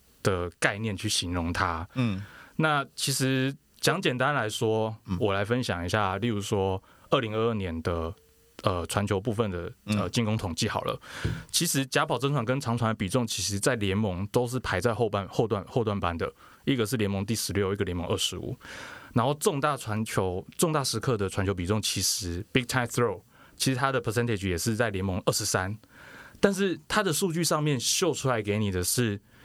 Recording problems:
squashed, flat; somewhat

